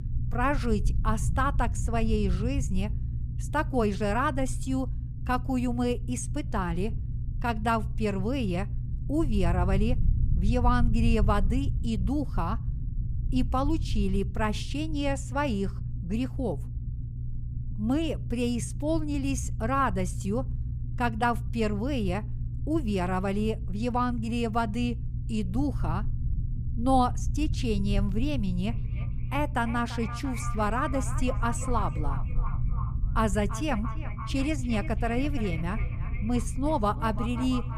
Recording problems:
echo of what is said; noticeable; from 29 s on; 340 ms later, 15 dB below the speech
low rumble; noticeable; throughout; 15 dB below the speech

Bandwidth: 15 kHz